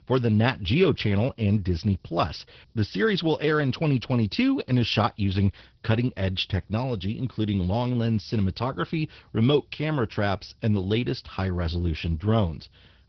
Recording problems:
garbled, watery; badly
high frequencies cut off; noticeable; nothing above 5.5 kHz

